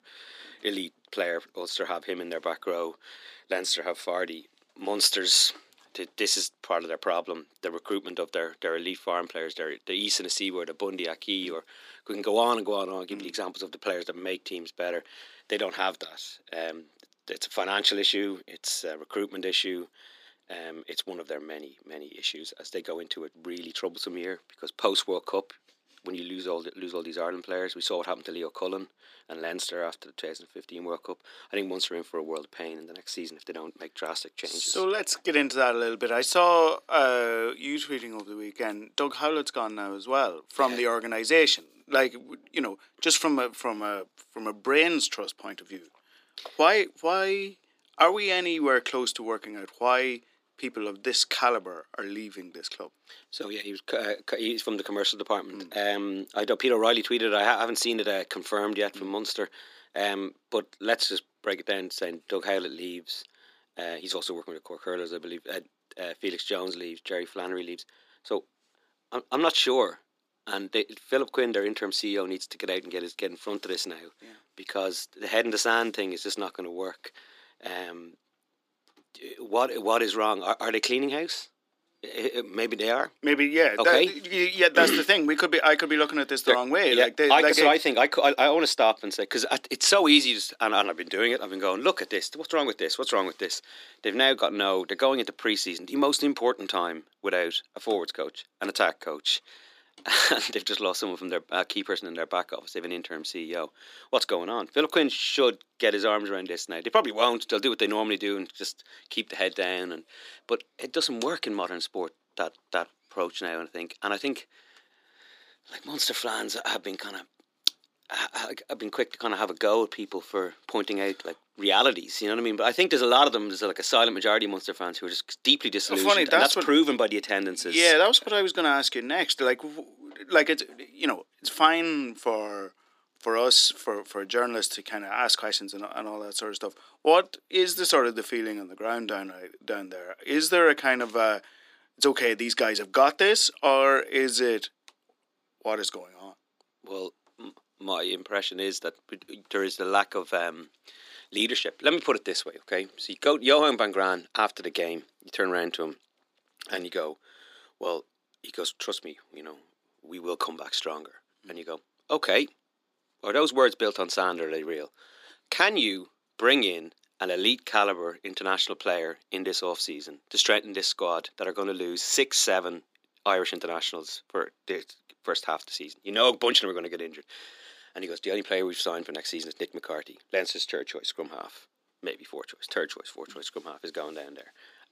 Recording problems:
thin; somewhat; fading below 300 Hz

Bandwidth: 15 kHz